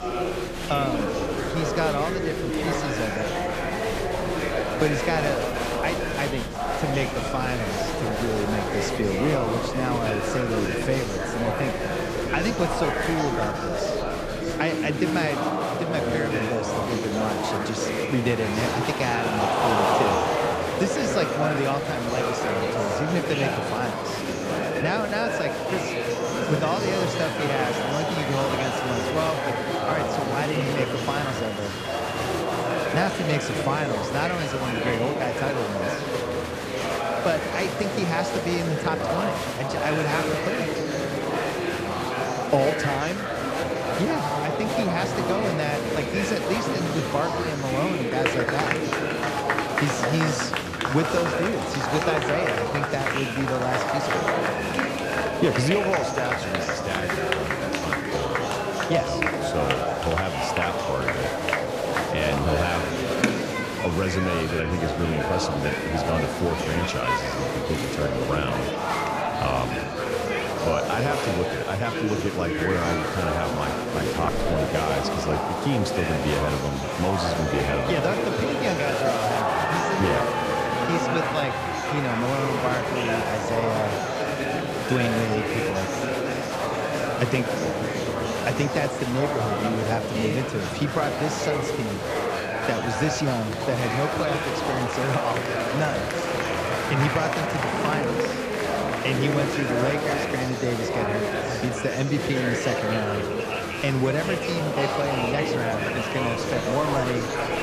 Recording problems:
murmuring crowd; very loud; throughout; 2 dB above the speech

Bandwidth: 14.5 kHz